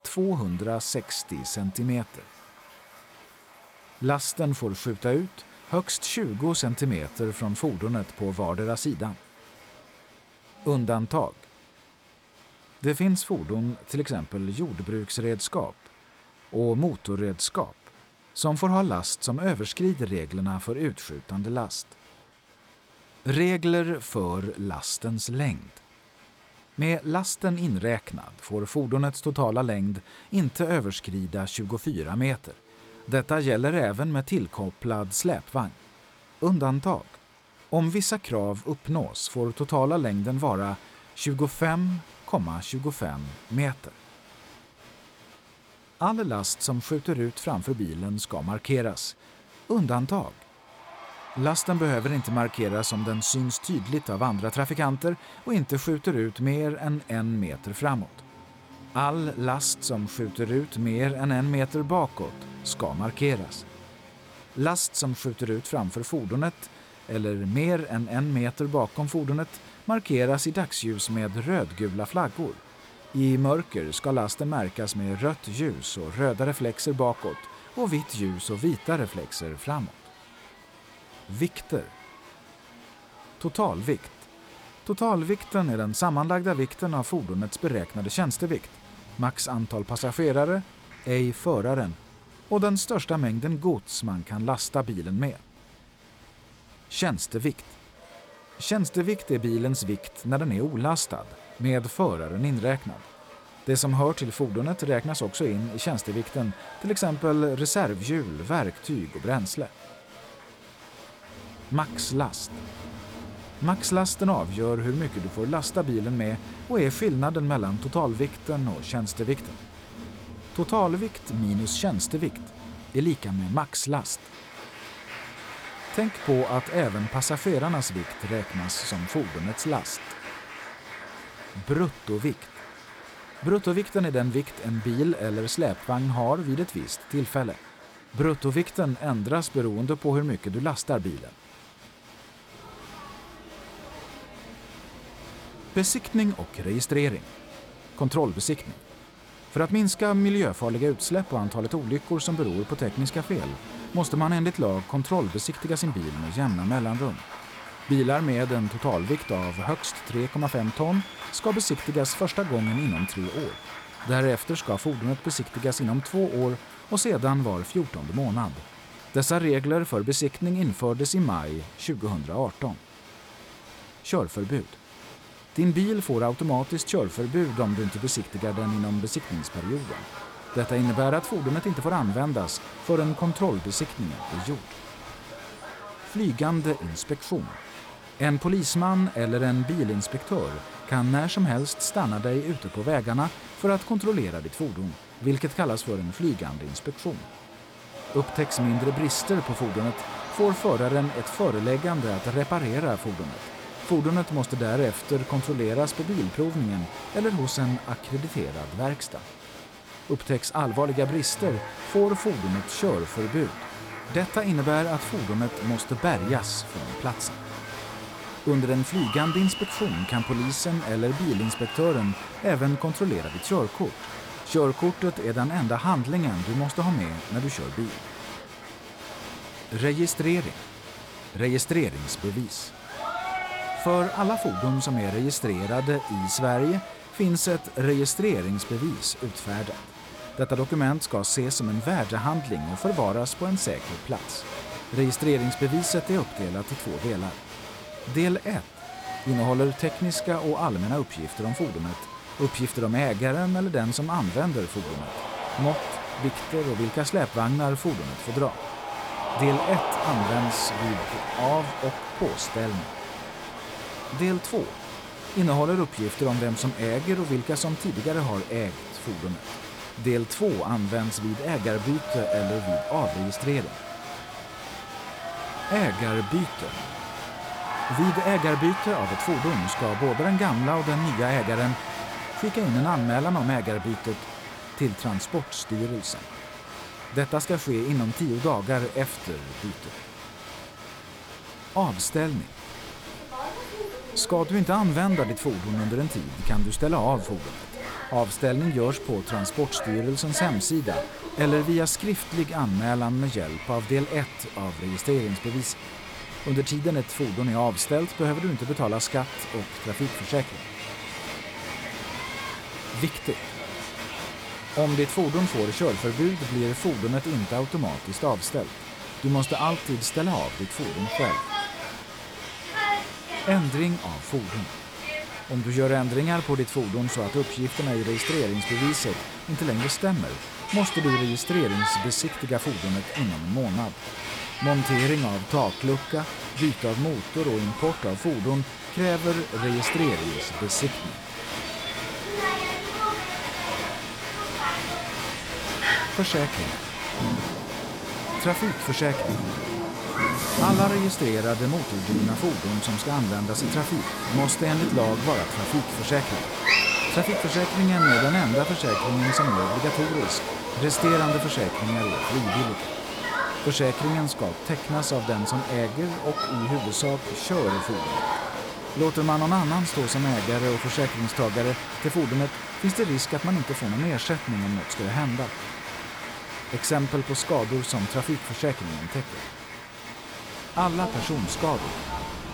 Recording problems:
crowd noise; loud; throughout; 7 dB below the speech

